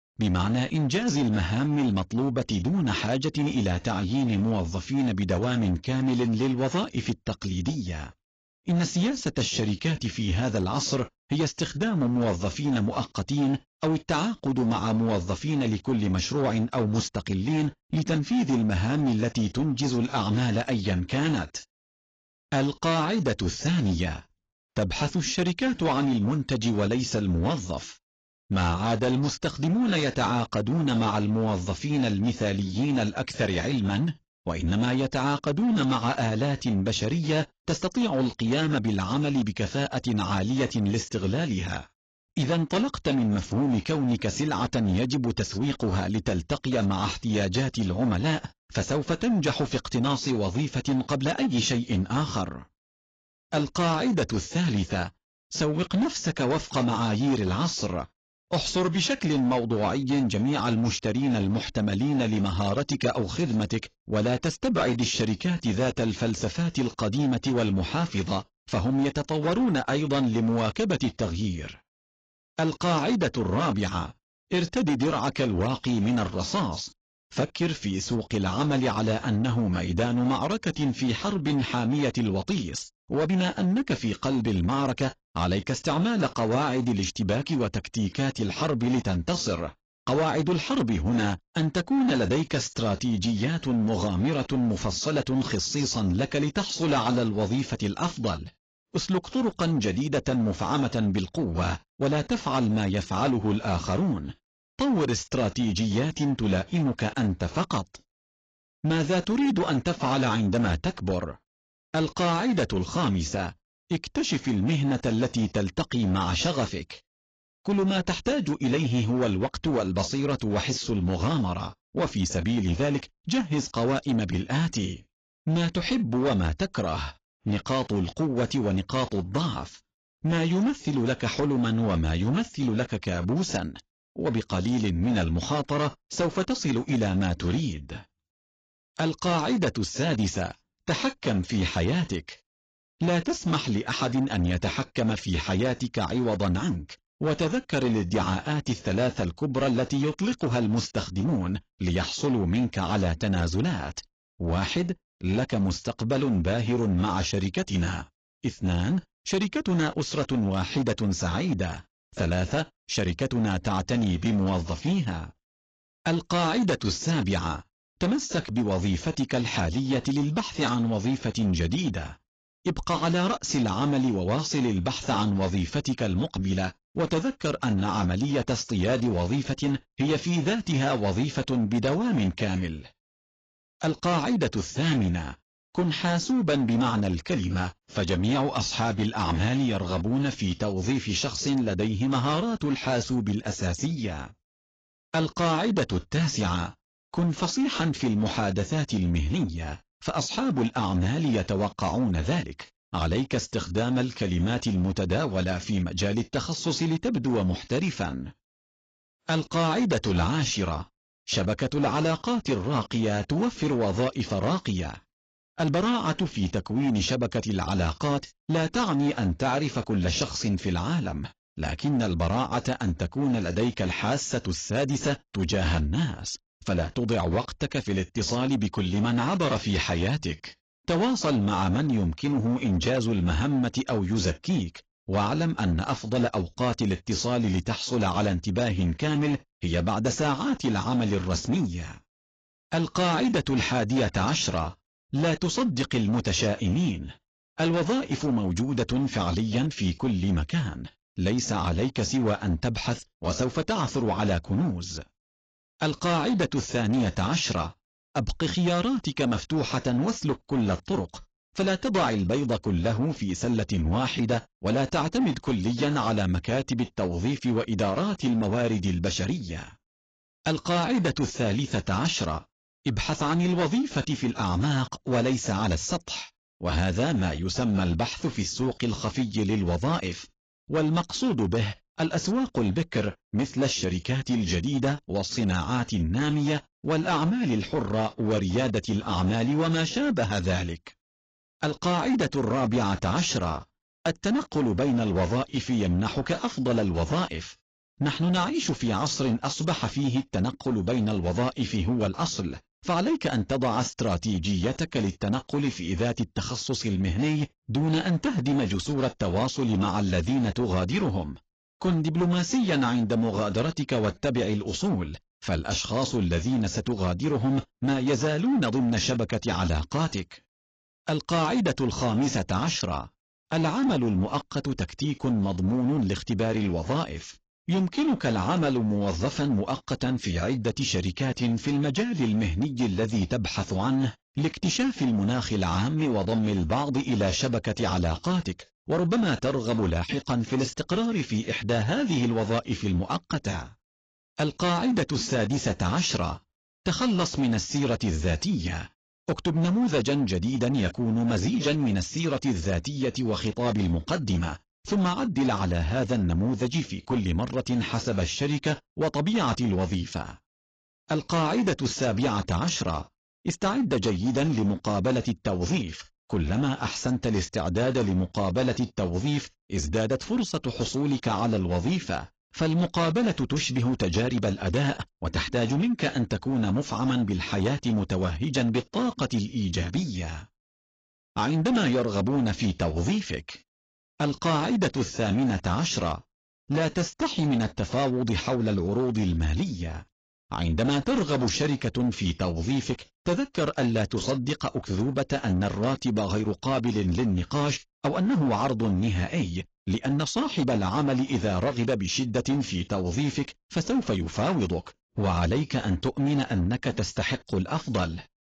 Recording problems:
garbled, watery; badly
distortion; slight; 10% of the sound clipped

